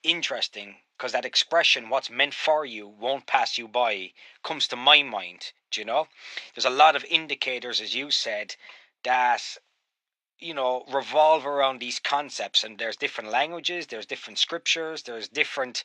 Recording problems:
thin; very; fading below 700 Hz

